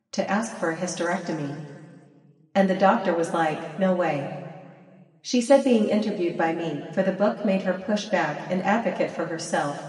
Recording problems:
off-mic speech; far
room echo; noticeable; dies away in 1.7 s
garbled, watery; slightly; nothing above 11 kHz

